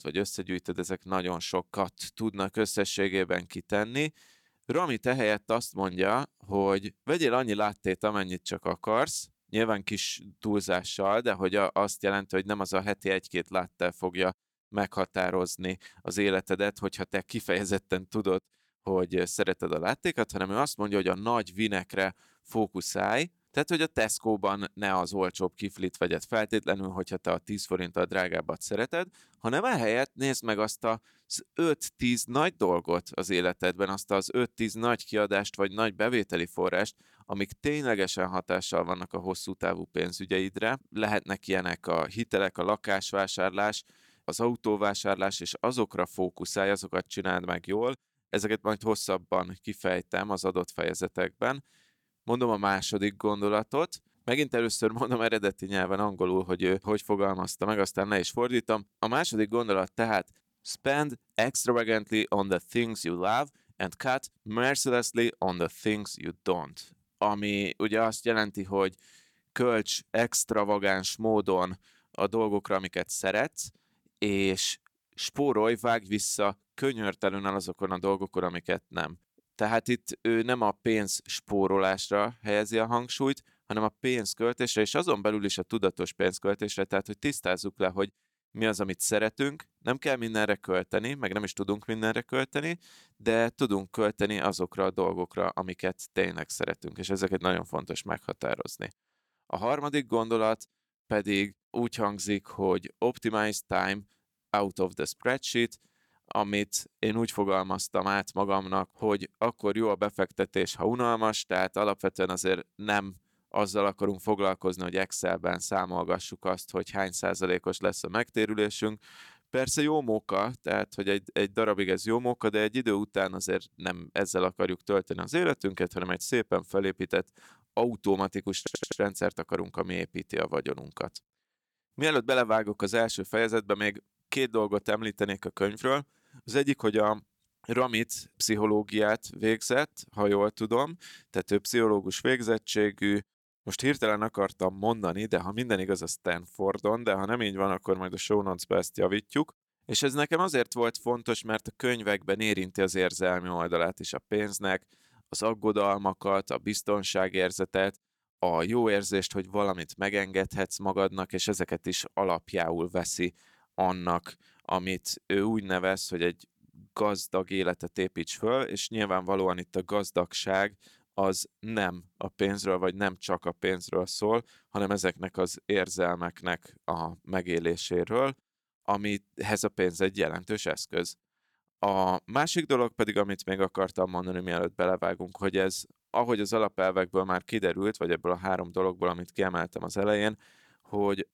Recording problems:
audio stuttering; at 2:09

